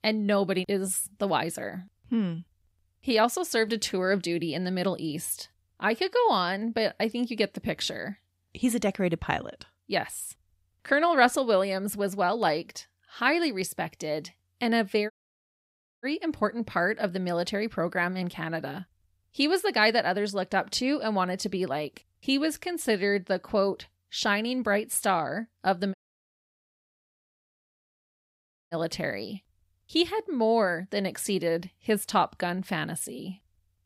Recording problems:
audio cutting out; at 15 s for 1 s and at 26 s for 3 s

